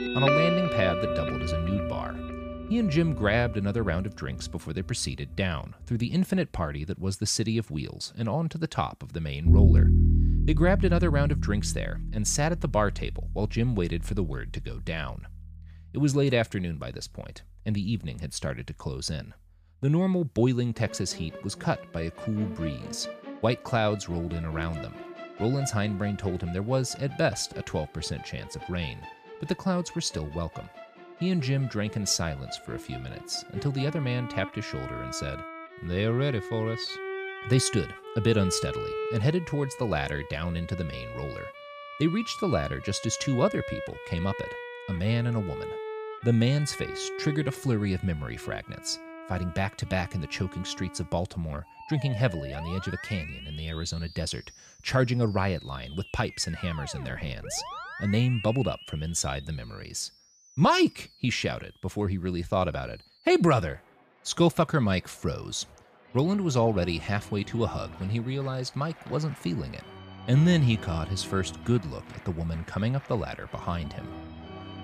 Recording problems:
background music; loud; throughout; 5 dB below the speech

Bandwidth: 15 kHz